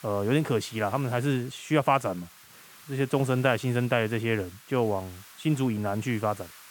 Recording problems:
hiss; faint; throughout; 20 dB below the speech

